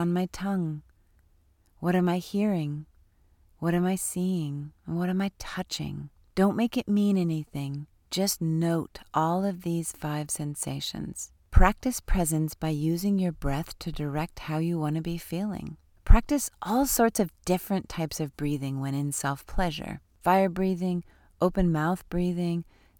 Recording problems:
abrupt cut into speech; at the start

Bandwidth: 17 kHz